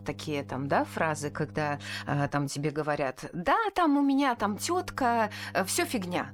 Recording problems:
electrical hum; faint; until 2.5 s and from 4.5 s on; 50 Hz, 25 dB below the speech

